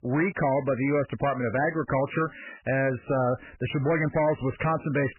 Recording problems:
garbled, watery; badly; nothing above 2.5 kHz
distortion; slight; 12% of the sound clipped

